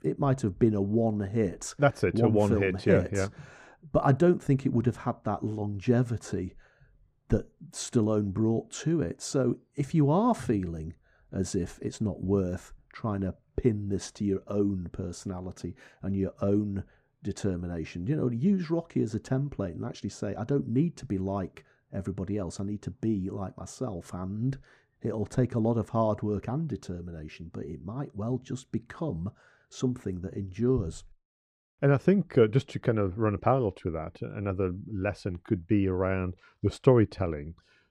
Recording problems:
muffled; slightly; fading above 2 kHz

